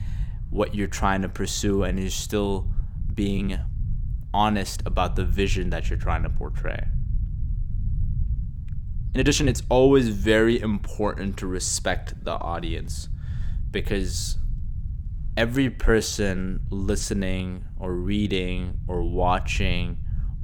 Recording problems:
low rumble; faint; throughout; 20 dB below the speech
uneven, jittery; strongly; from 3 to 17 s

